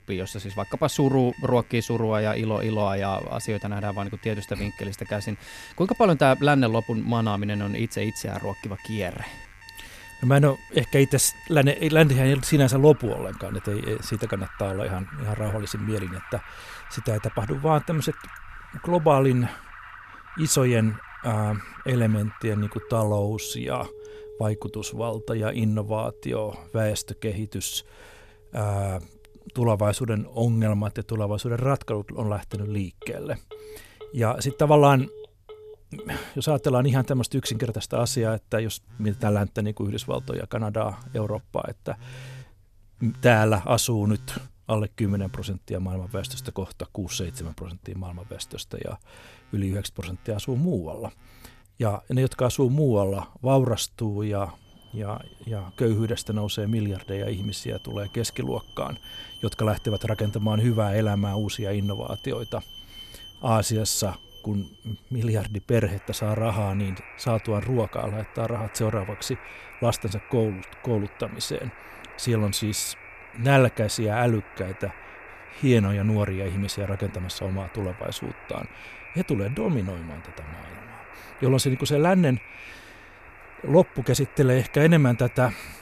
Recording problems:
alarms or sirens; noticeable; throughout; 20 dB below the speech

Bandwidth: 14 kHz